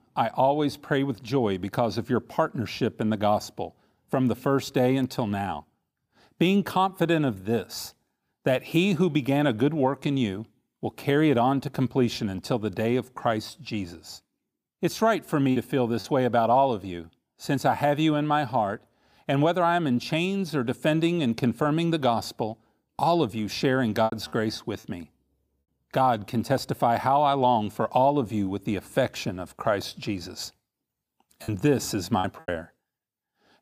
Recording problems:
choppy; very; at 16 s, at 24 s and from 31 to 32 s; 8% of the speech affected

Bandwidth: 15 kHz